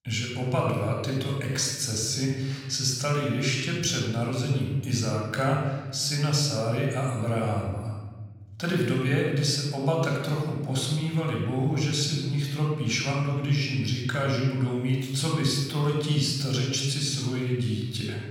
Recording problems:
room echo; noticeable; dies away in 1.4 s
off-mic speech; somewhat distant

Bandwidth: 17 kHz